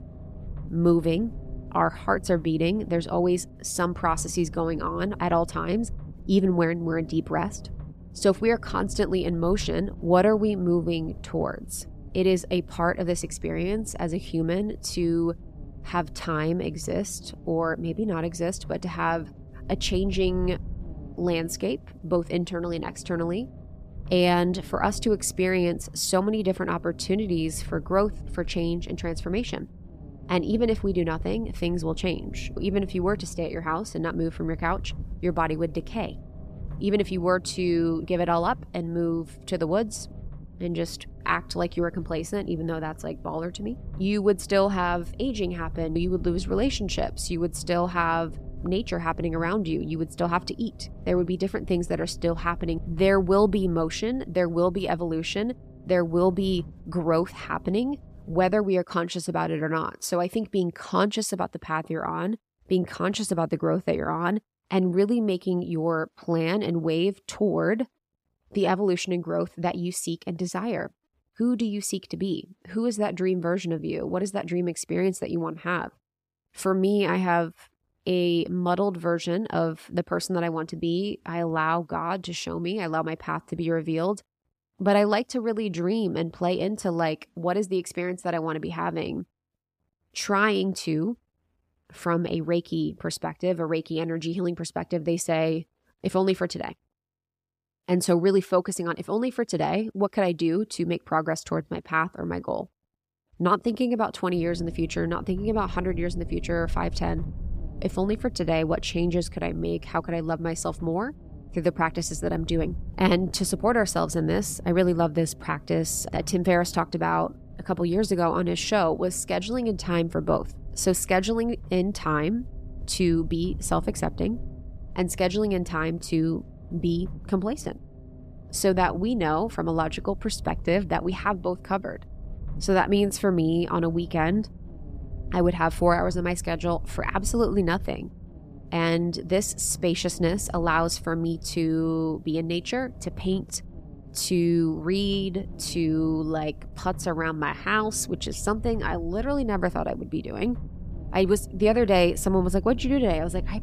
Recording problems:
low rumble; faint; until 59 s and from 1:44 on; 25 dB below the speech

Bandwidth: 15 kHz